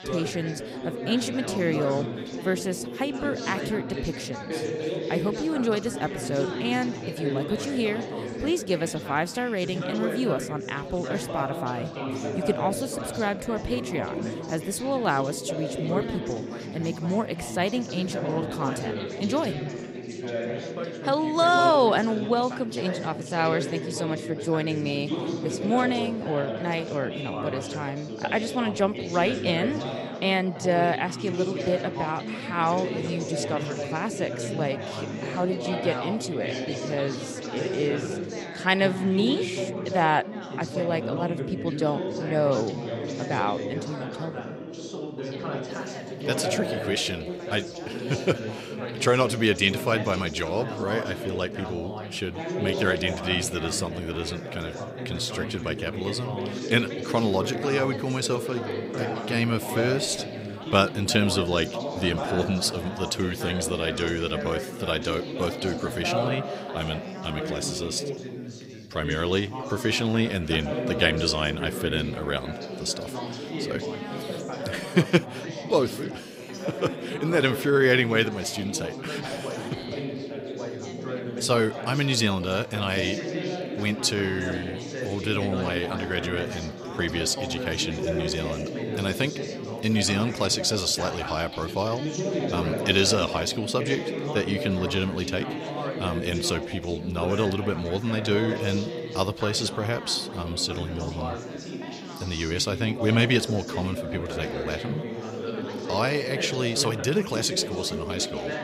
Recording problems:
background chatter; loud; throughout; 4 voices, 5 dB below the speech

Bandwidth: 15.5 kHz